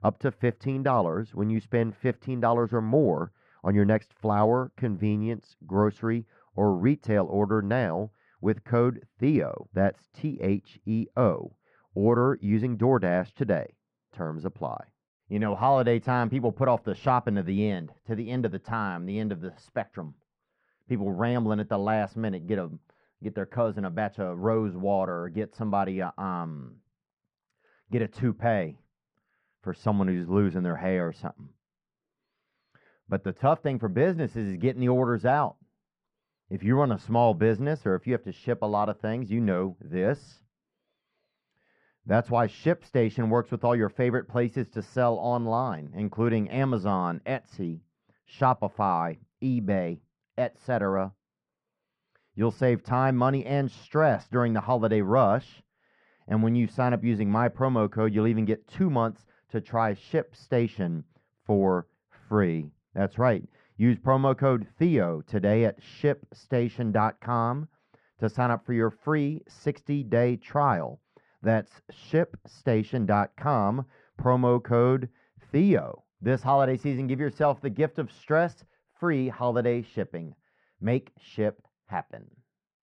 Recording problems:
muffled; very; fading above 1.5 kHz

